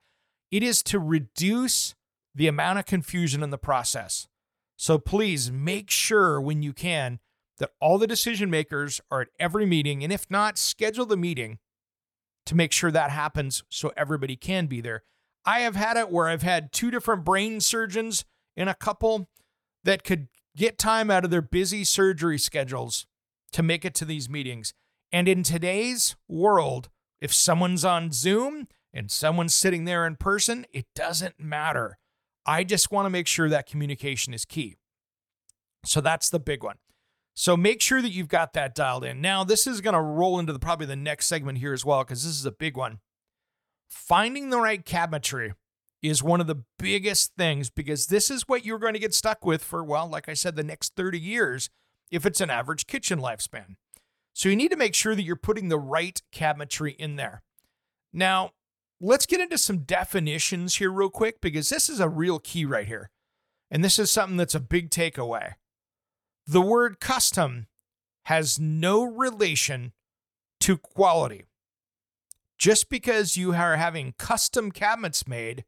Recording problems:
none

